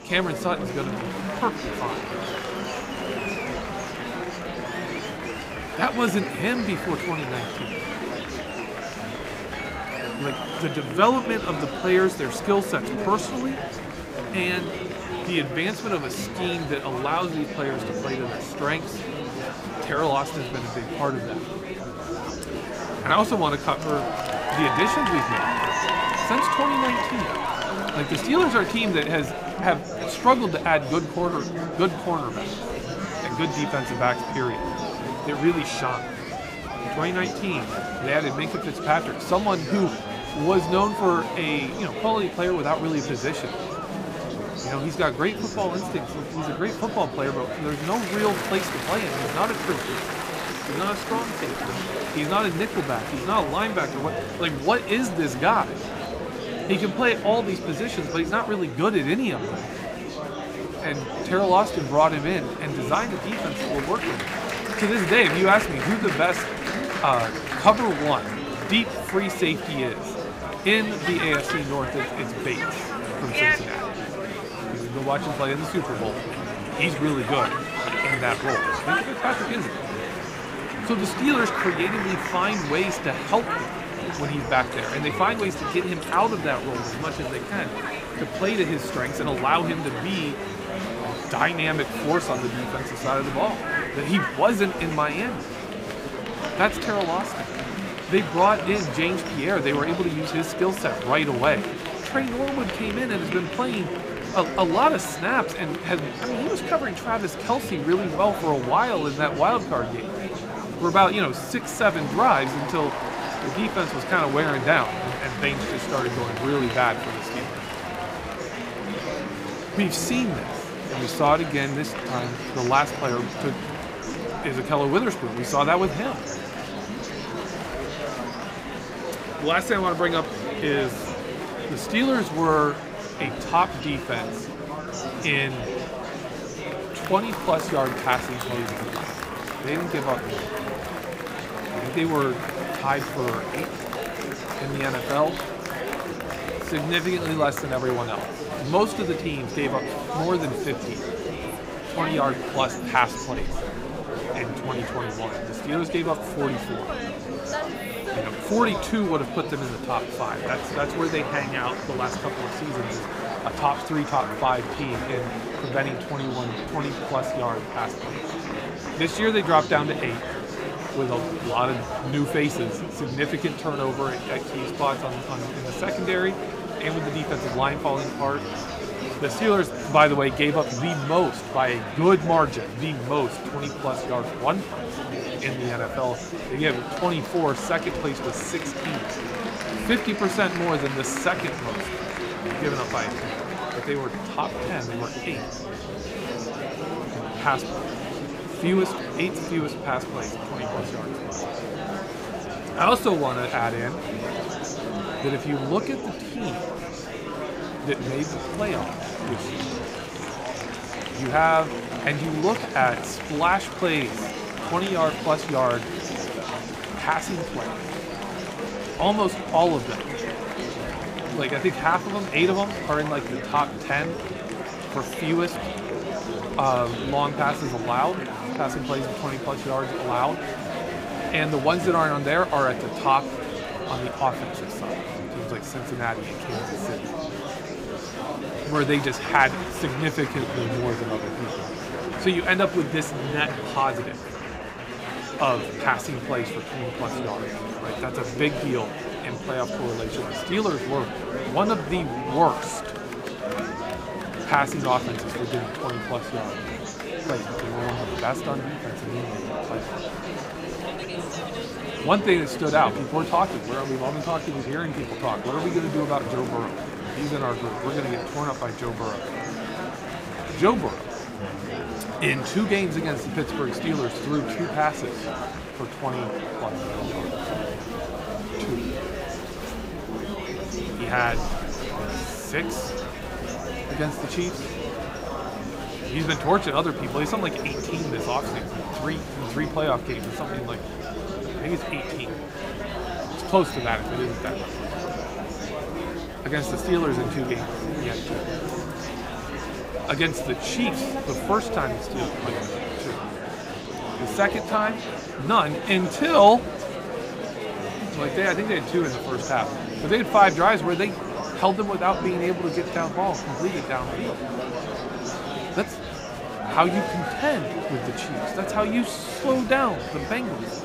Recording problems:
murmuring crowd; loud; throughout; 5 dB below the speech

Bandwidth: 15.5 kHz